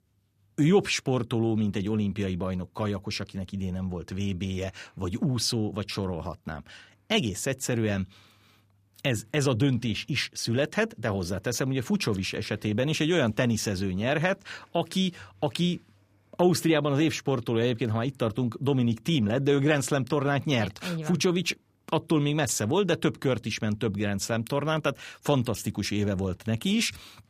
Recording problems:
none

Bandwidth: 15 kHz